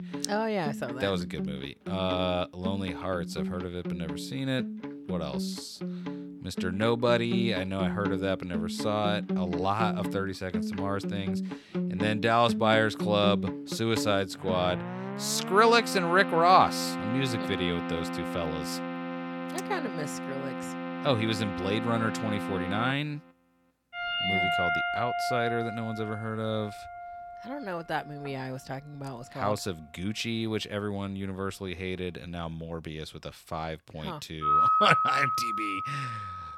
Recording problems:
background music; loud; throughout; 3 dB below the speech

